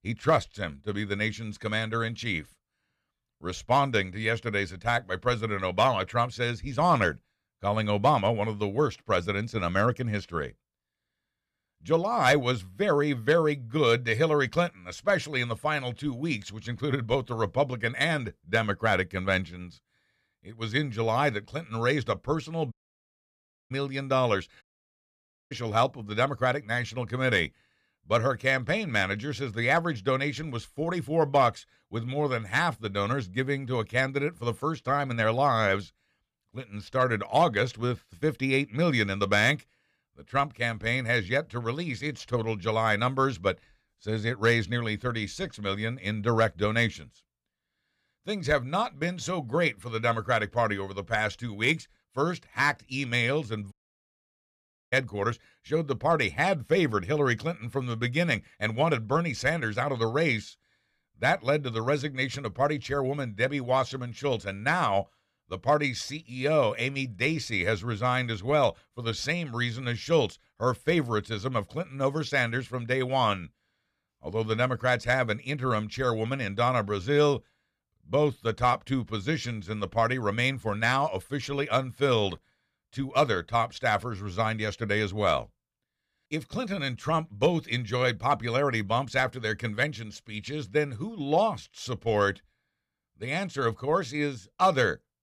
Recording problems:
audio cutting out; at 23 s for 1 s, at 25 s for 1 s and at 54 s for 1 s

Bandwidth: 15 kHz